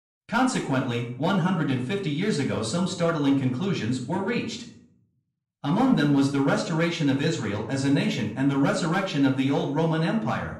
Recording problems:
off-mic speech; far
room echo; slight; dies away in 0.6 s

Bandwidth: 15.5 kHz